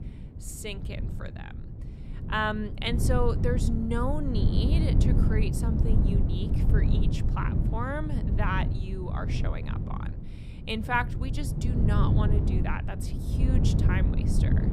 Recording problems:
wind noise on the microphone; heavy; 5 dB below the speech

